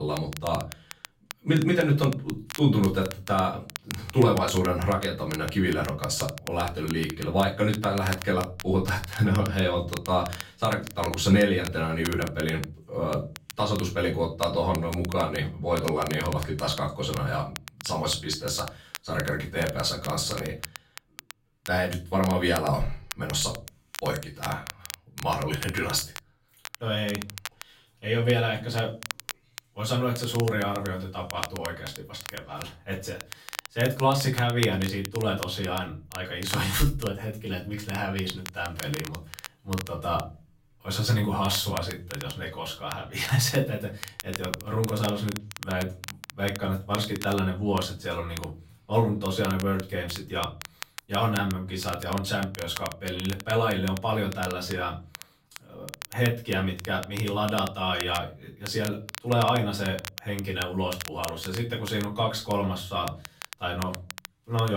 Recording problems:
off-mic speech; far
room echo; slight; dies away in 0.3 s
crackle, like an old record; noticeable; 15 dB below the speech
abrupt cut into speech; at the start and the end

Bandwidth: 16 kHz